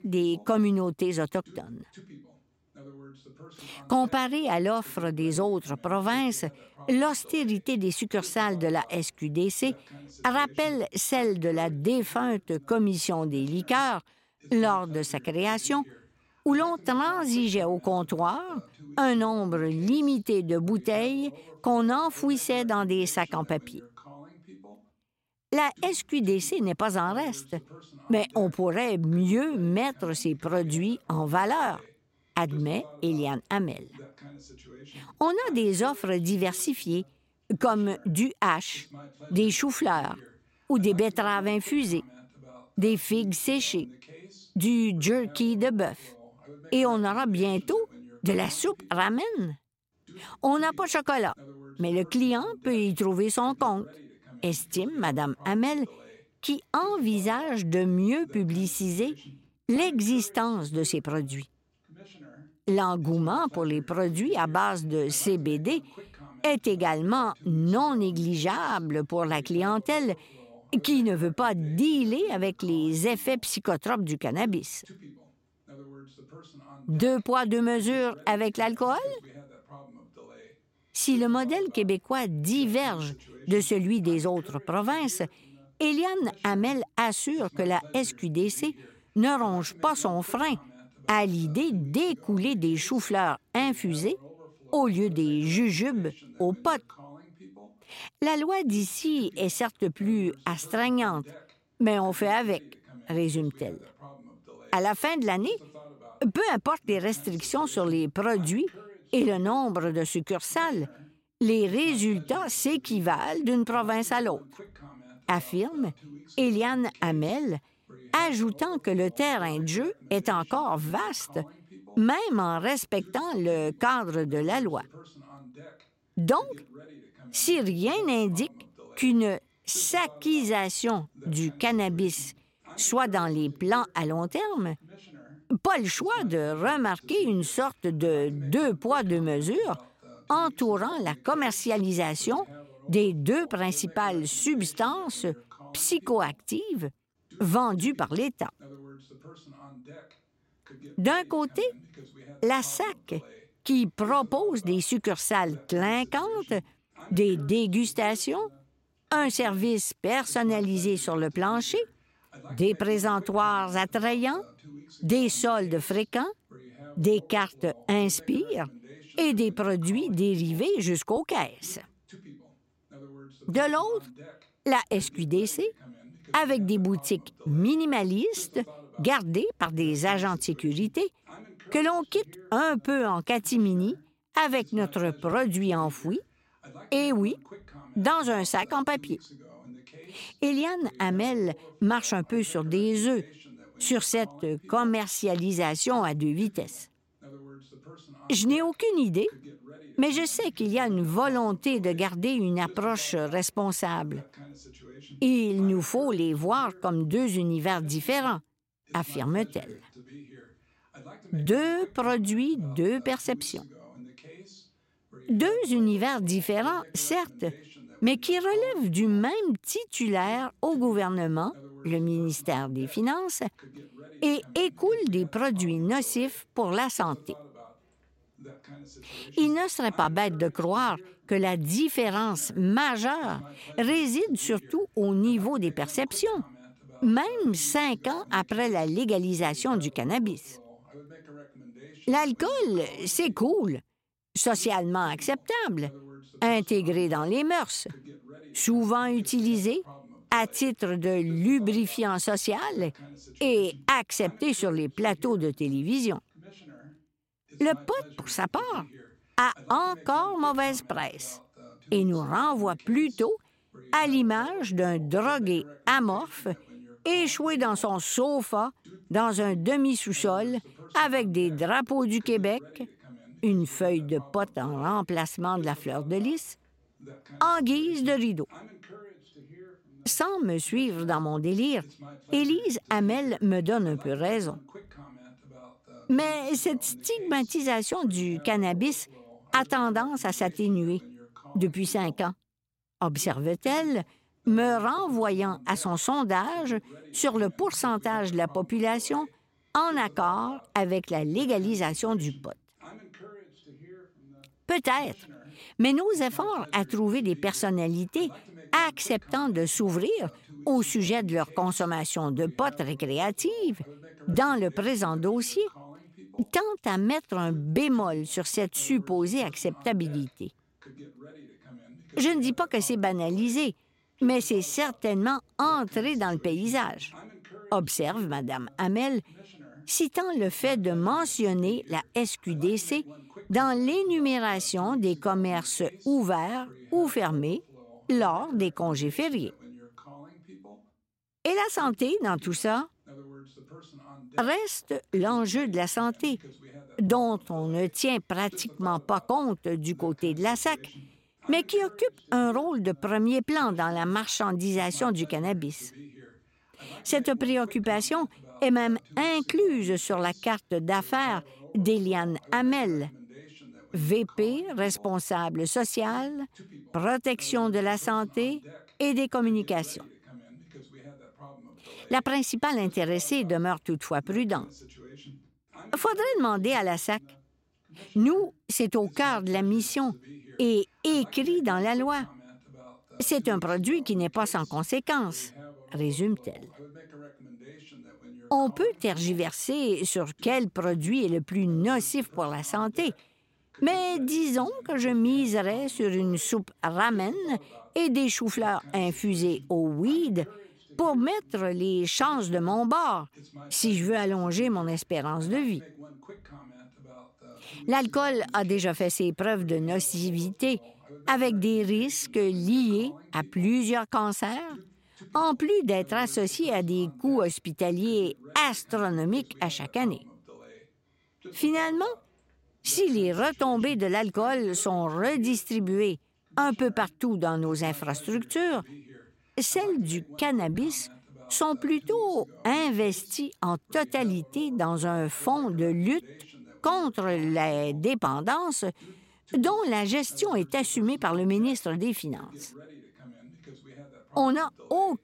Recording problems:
voice in the background; faint; throughout; 25 dB below the speech

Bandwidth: 16 kHz